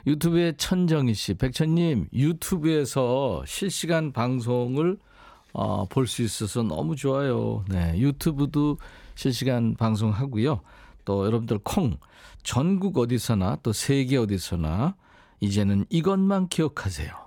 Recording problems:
none

